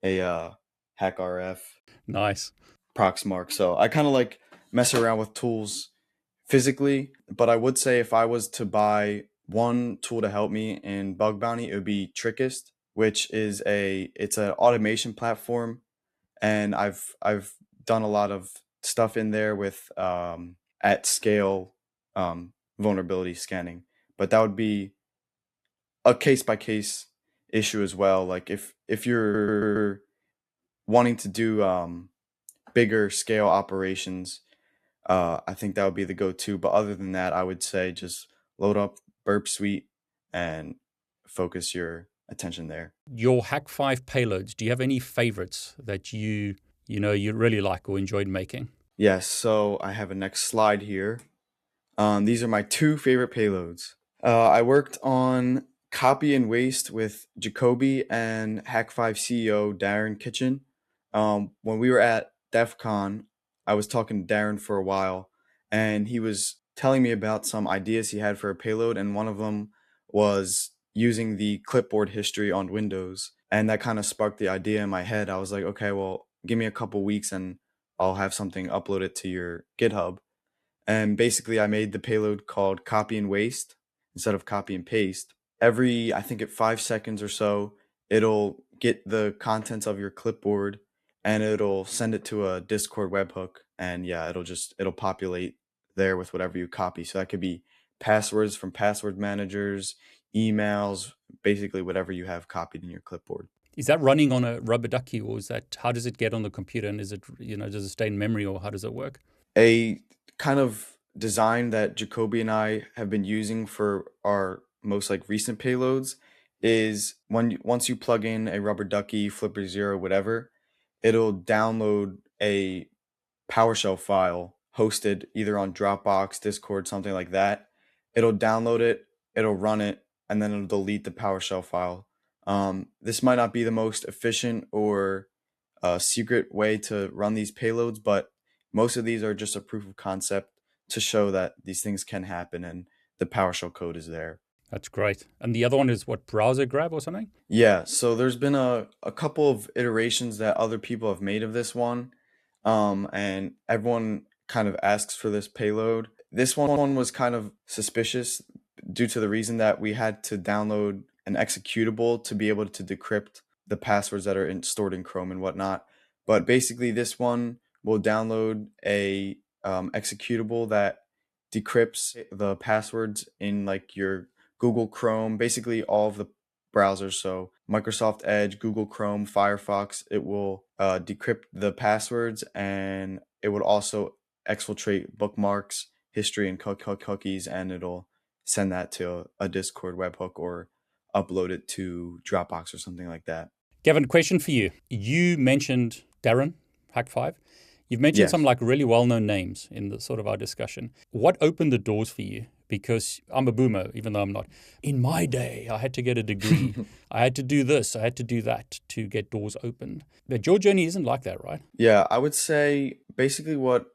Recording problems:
audio stuttering; at 29 s, at 2:37 and at 3:07

